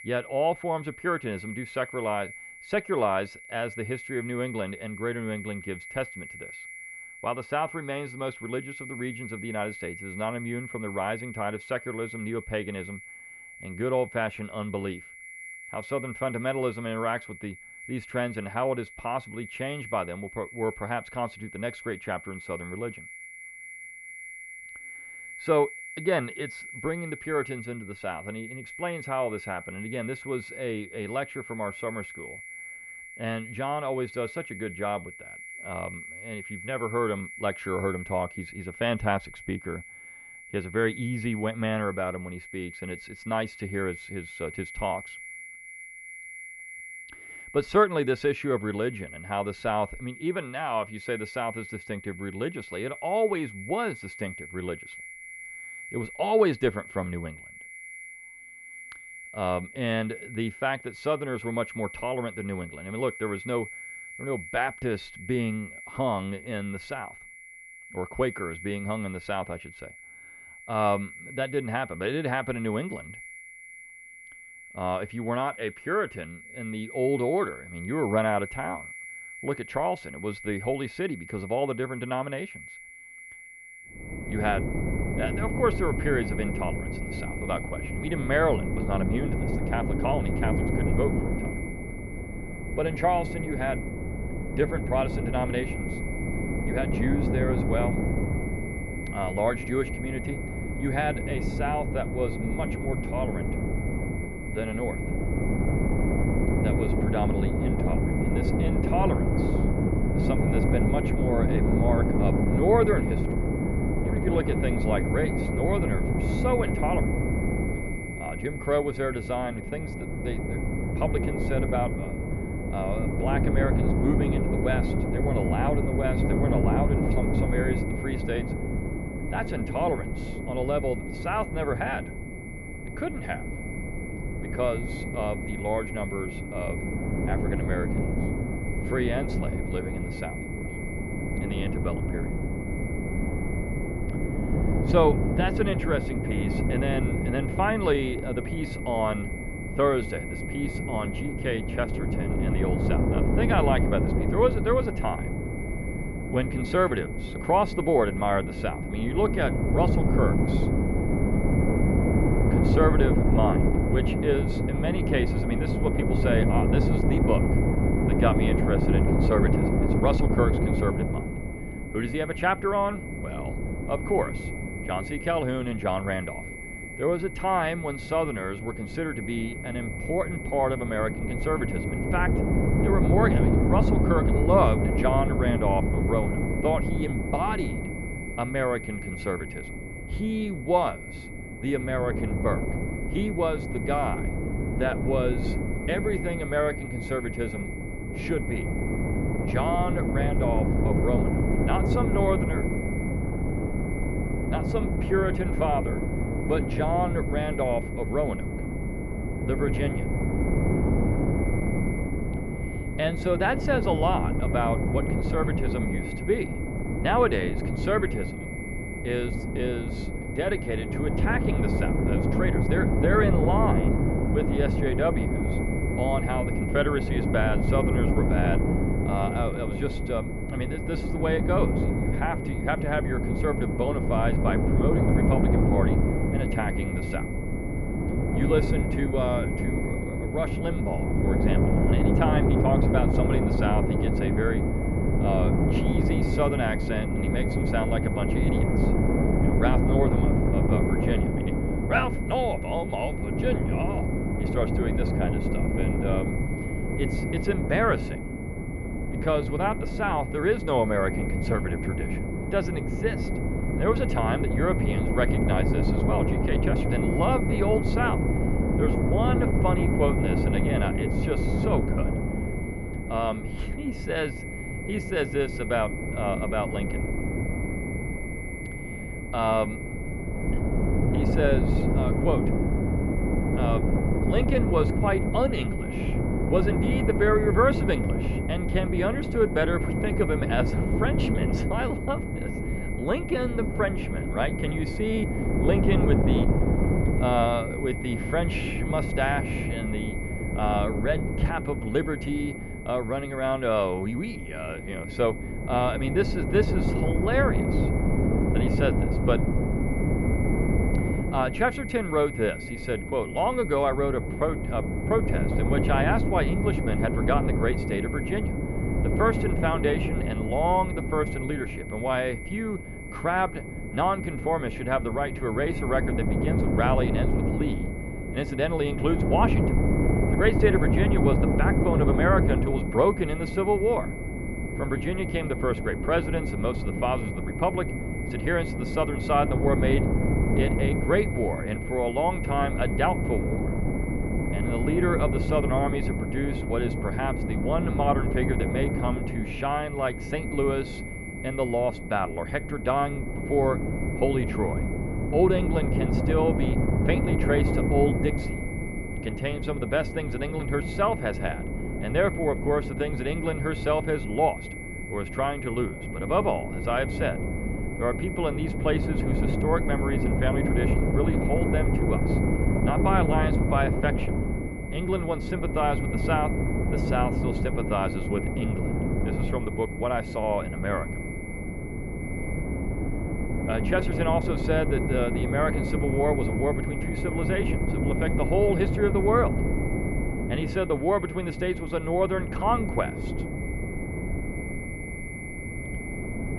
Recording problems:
muffled; very; fading above 2 kHz
wind noise on the microphone; heavy; from 1:24 on; 5 dB below the speech
high-pitched whine; noticeable; throughout; 2 kHz, 10 dB below the speech

